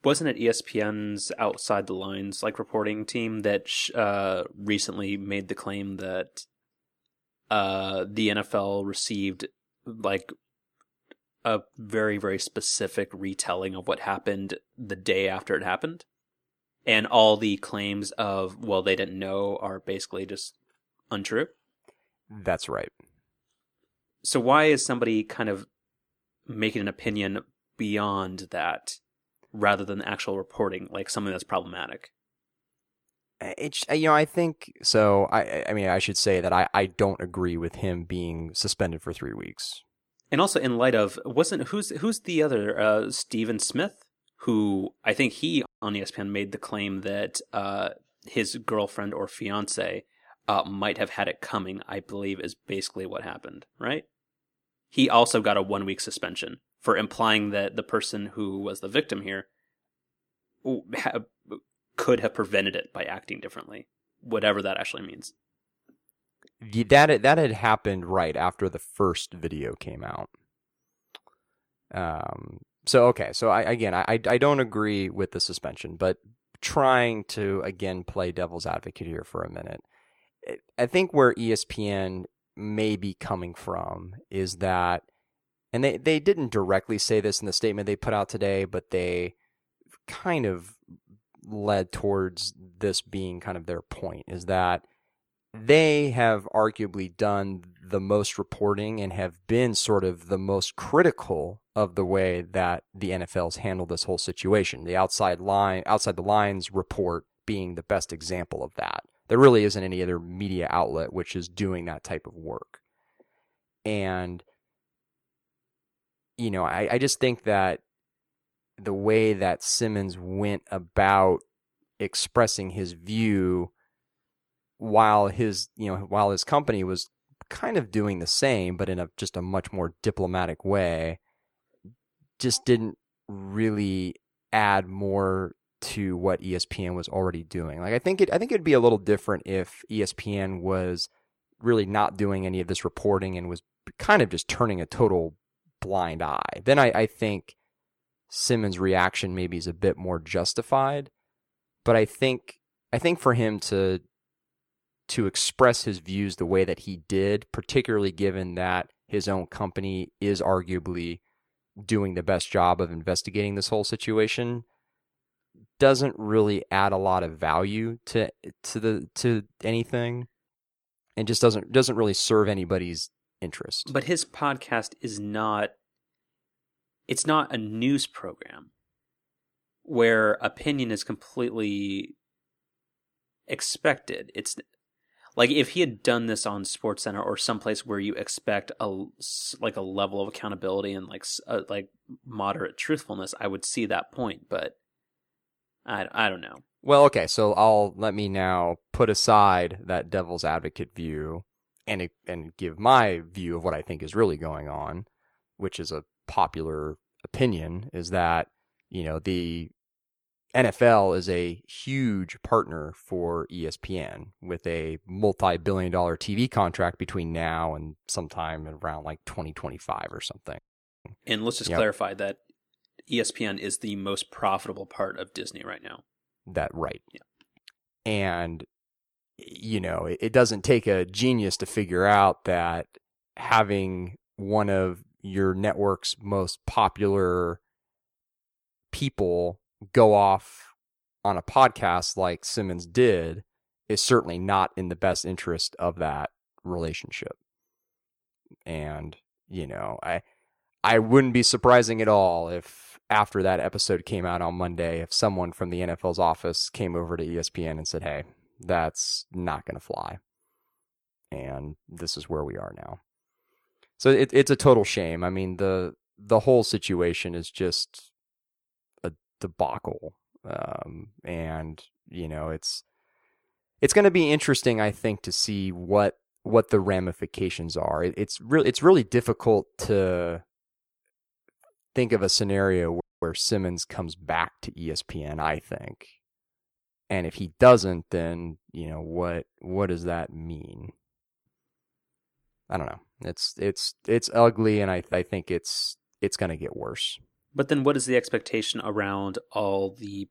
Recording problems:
audio cutting out; at 46 s, at 3:41 and at 4:43

